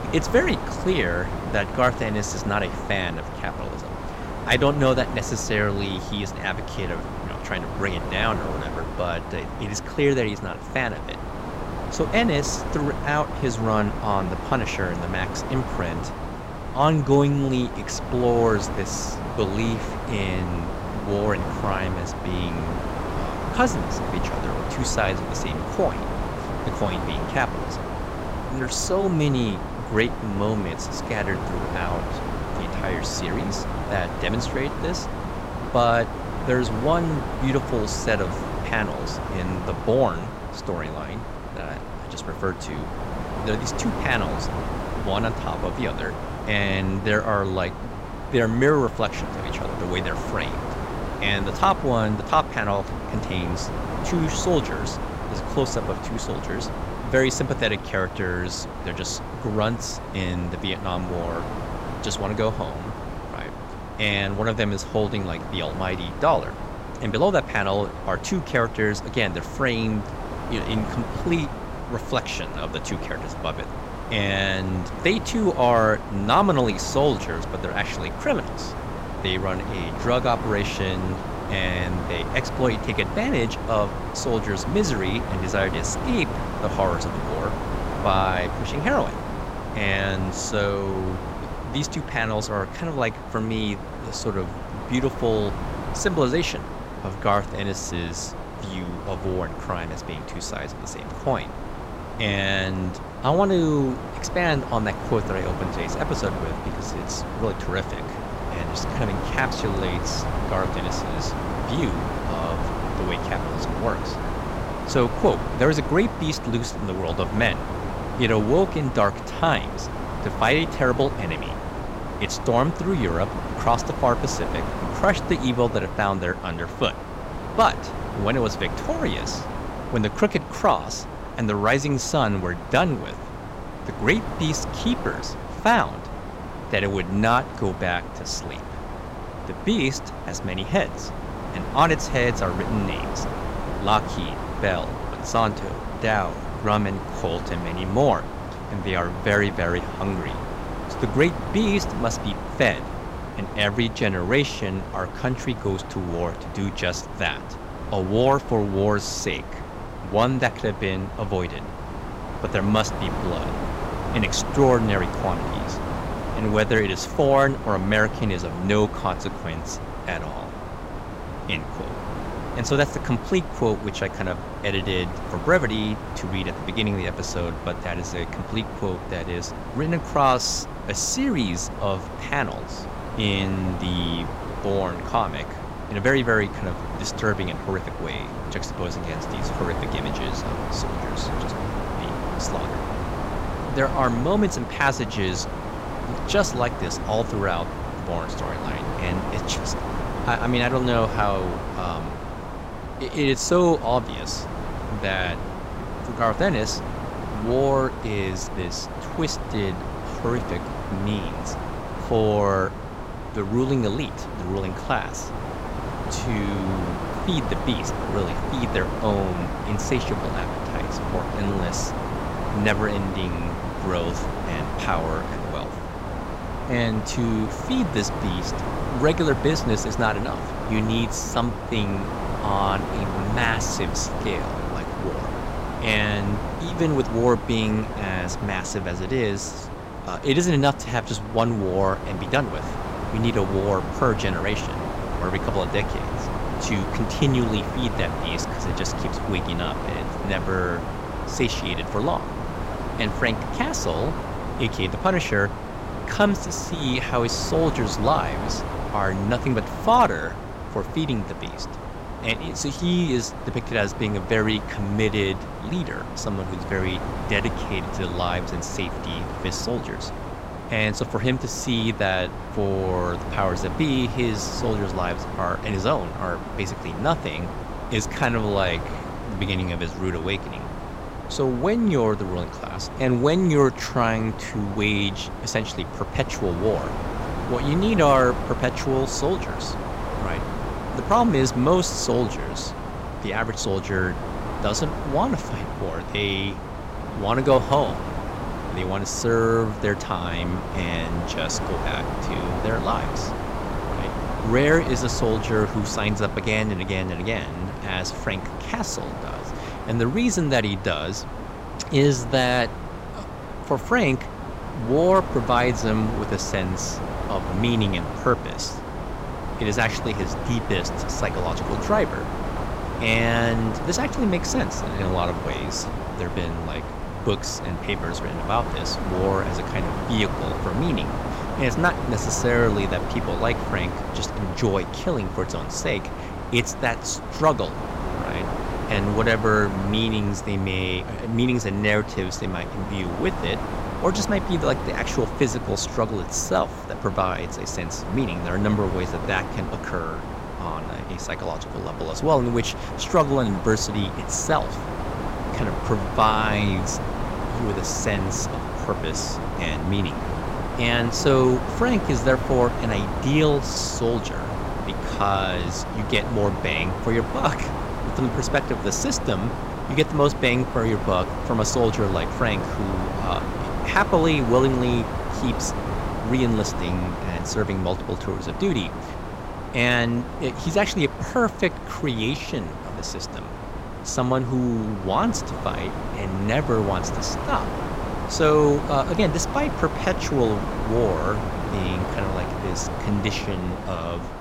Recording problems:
wind noise on the microphone; heavy; 7 dB below the speech

